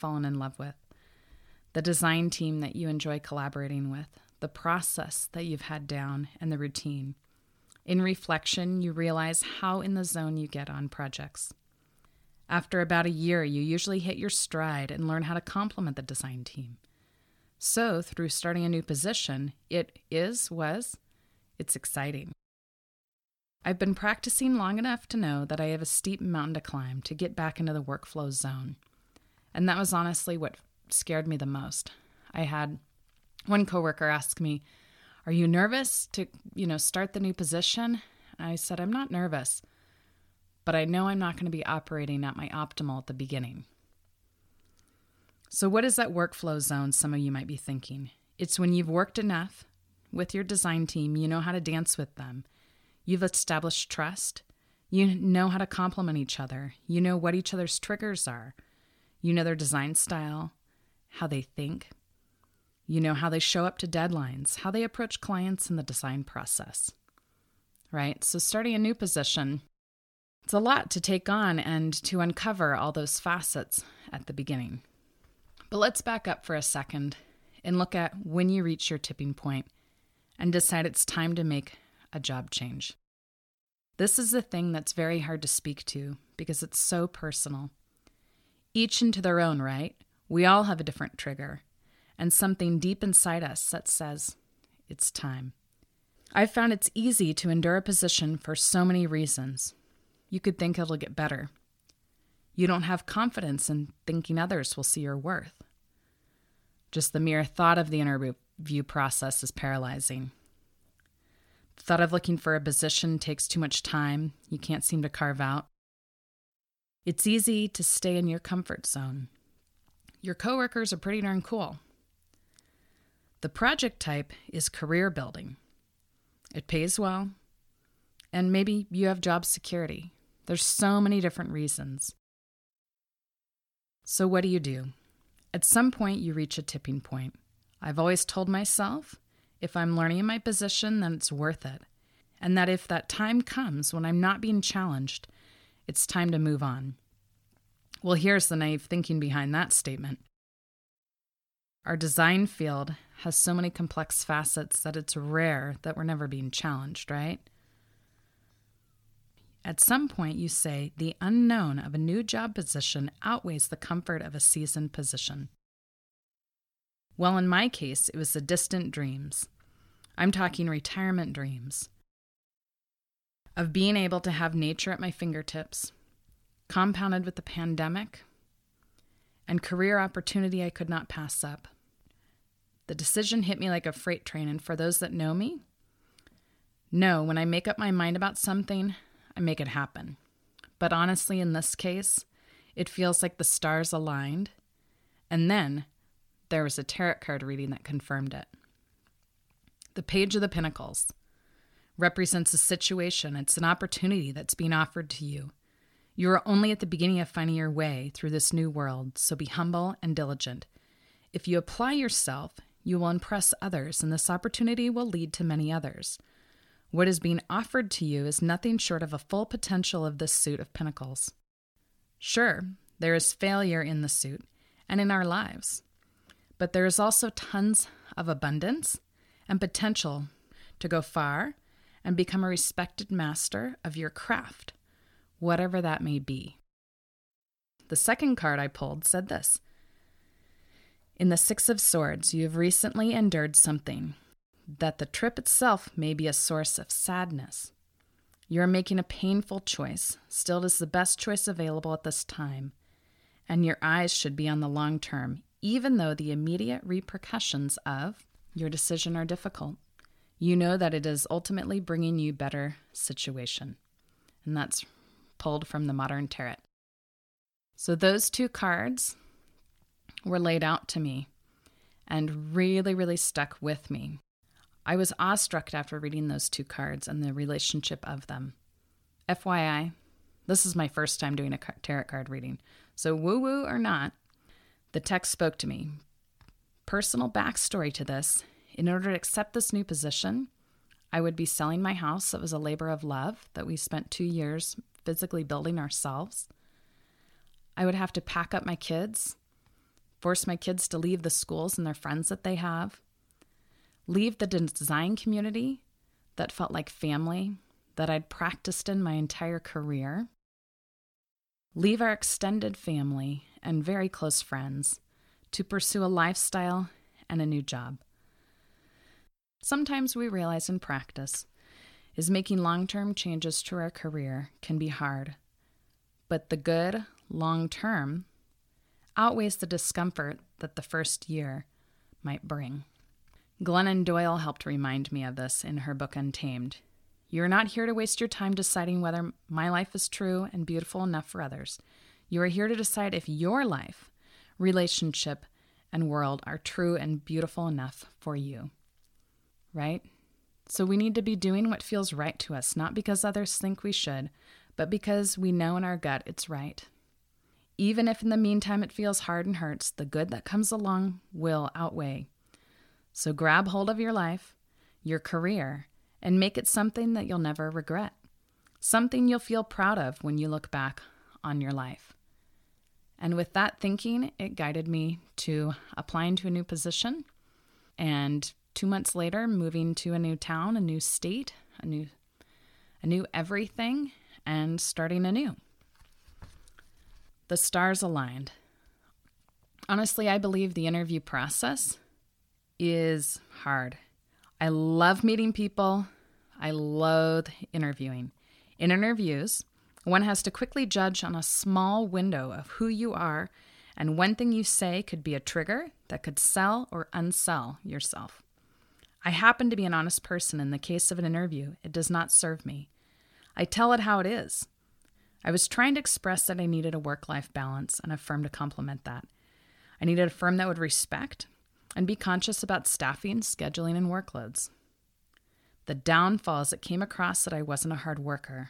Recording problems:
none

